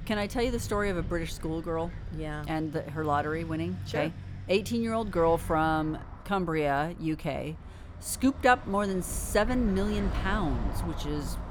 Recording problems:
traffic noise; noticeable; throughout; 15 dB below the speech
wind noise on the microphone; occasional gusts; 20 dB below the speech

